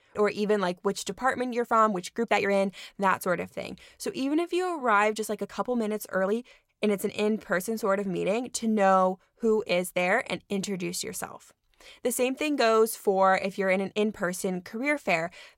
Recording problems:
uneven, jittery; strongly; from 1 to 15 s

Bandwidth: 16 kHz